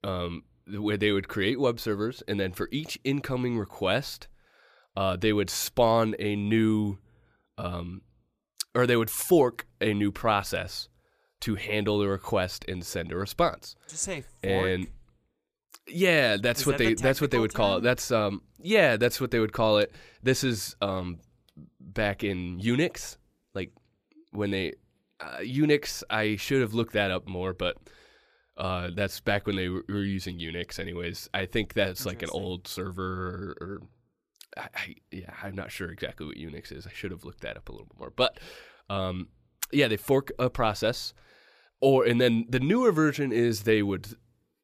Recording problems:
none

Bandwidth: 14.5 kHz